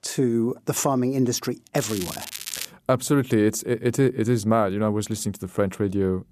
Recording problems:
crackling; loud; at 2 s; 10 dB below the speech

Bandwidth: 14.5 kHz